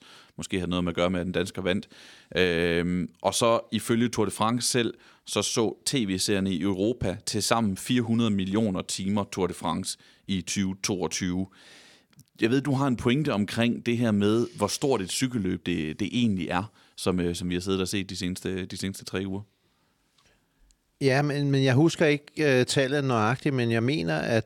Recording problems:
none

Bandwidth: 17 kHz